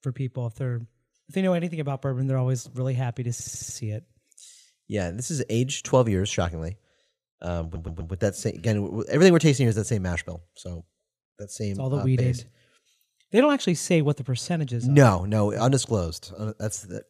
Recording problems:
audio stuttering; at 3.5 s and at 7.5 s

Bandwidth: 14.5 kHz